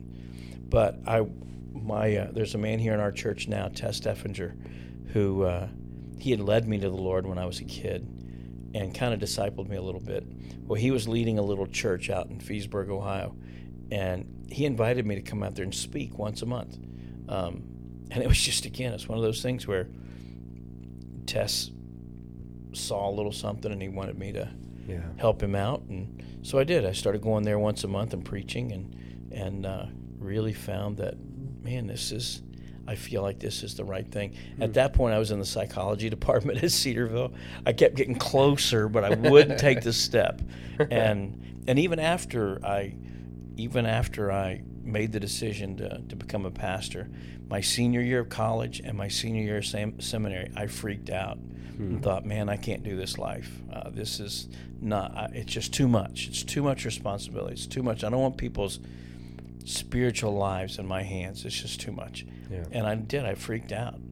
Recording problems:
electrical hum; faint; throughout; 60 Hz, 20 dB below the speech

